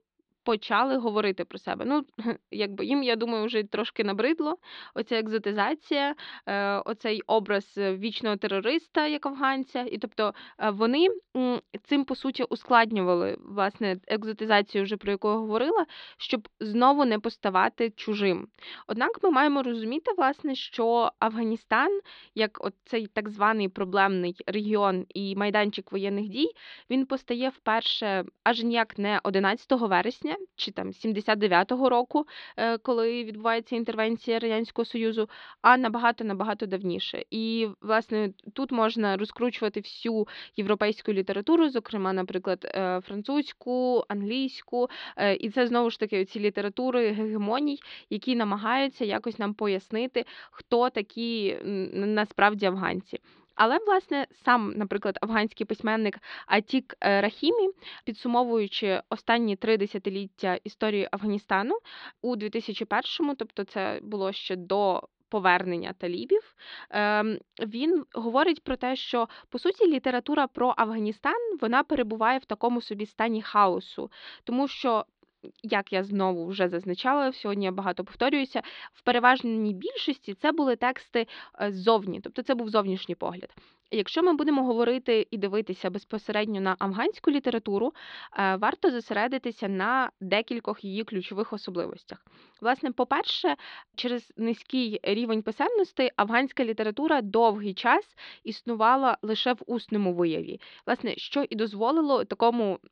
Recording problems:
muffled; very slightly; fading above 4 kHz

